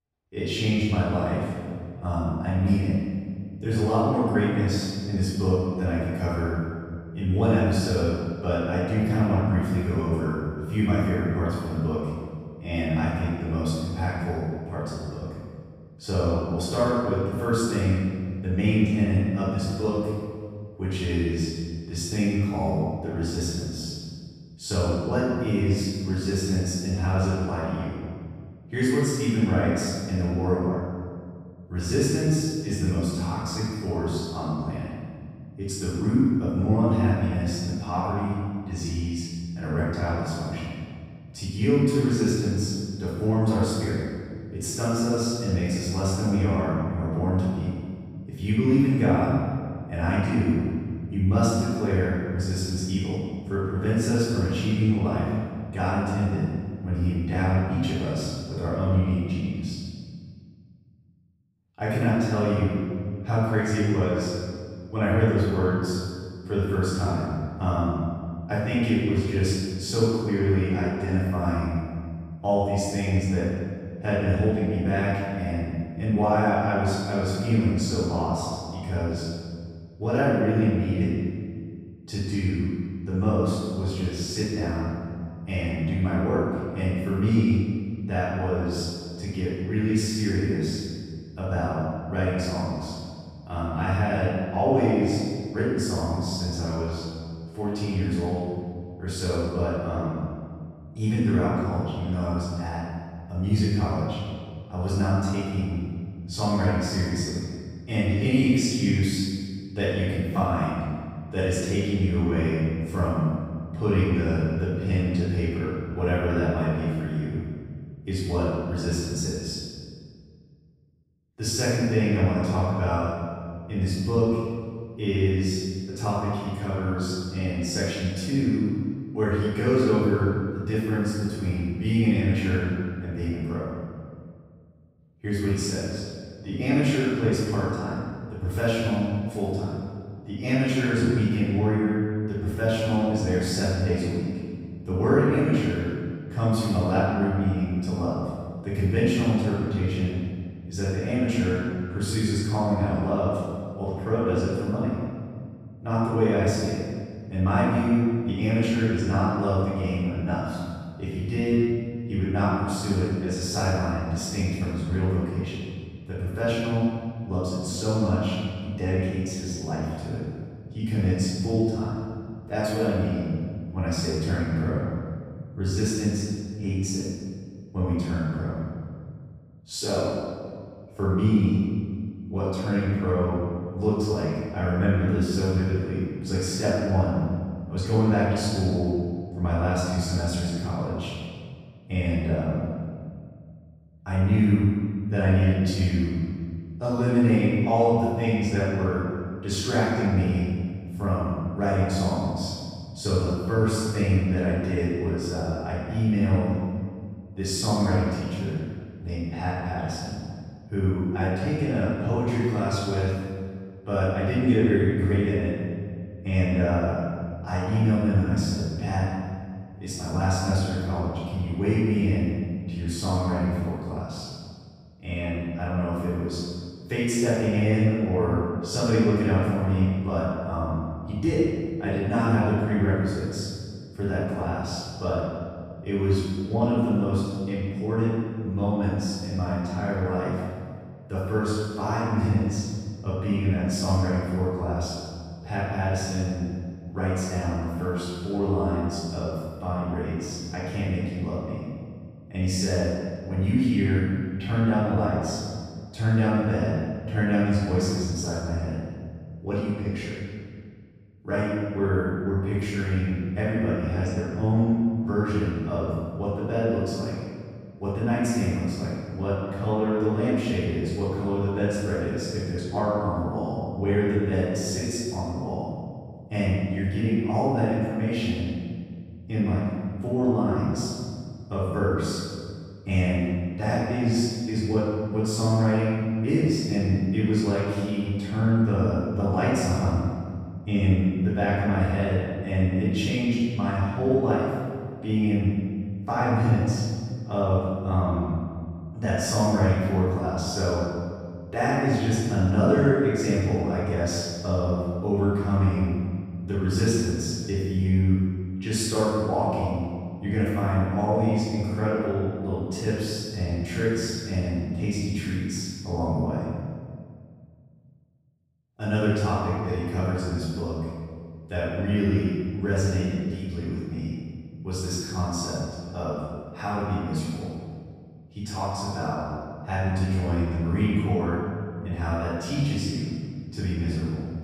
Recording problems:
room echo; strong; dies away in 1.8 s
off-mic speech; far

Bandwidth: 15.5 kHz